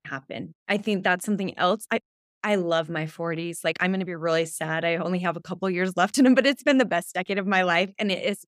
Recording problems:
uneven, jittery; strongly; from 0.5 to 7.5 s

